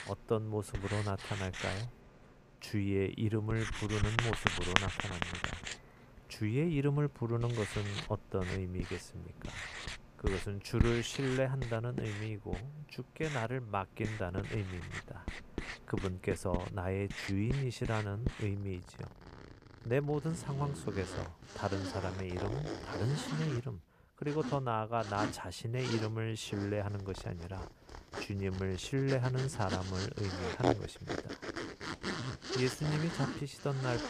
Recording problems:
household noises; loud; throughout; 4 dB below the speech

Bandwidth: 14.5 kHz